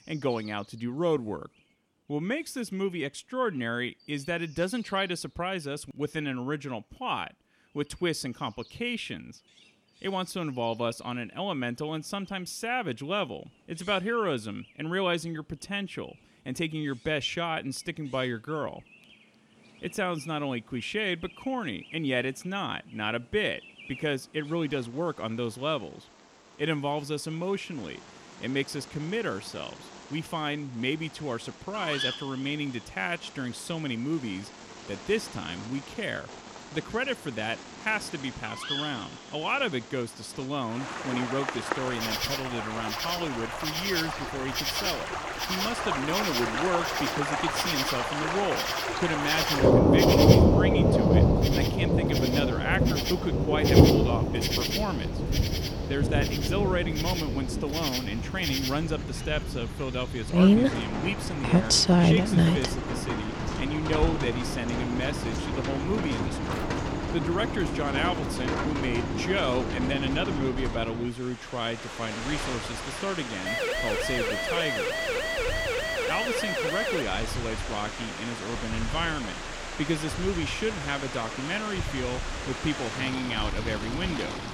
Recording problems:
rain or running water; very loud; from 41 s on; 4 dB above the speech
animal sounds; loud; throughout; 6 dB below the speech
siren; loud; from 1:13 to 1:17; peak 3 dB above the speech

